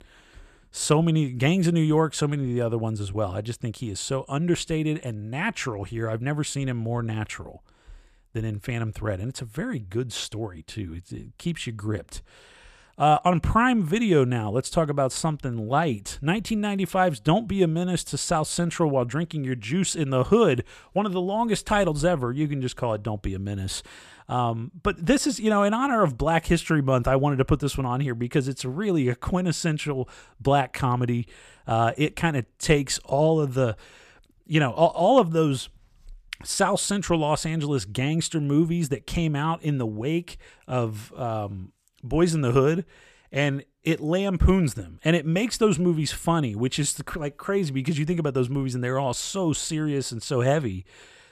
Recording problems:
none

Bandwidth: 14.5 kHz